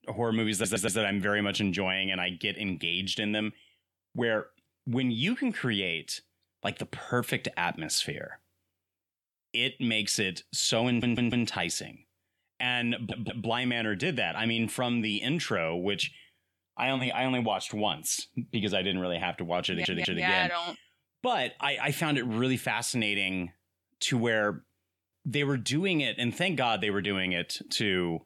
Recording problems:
audio stuttering; 4 times, first at 0.5 s

